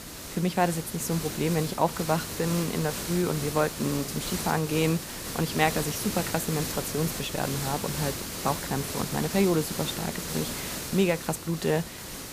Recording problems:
hiss; loud; throughout; 5 dB below the speech

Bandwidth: 15 kHz